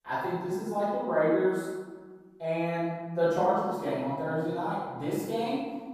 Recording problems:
room echo; strong; dies away in 1.3 s
off-mic speech; far

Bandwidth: 14.5 kHz